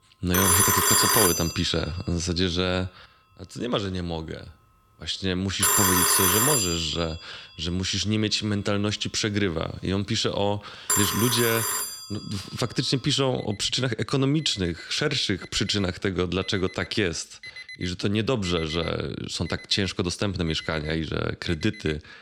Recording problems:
alarms or sirens; very loud; throughout; 5 dB above the speech

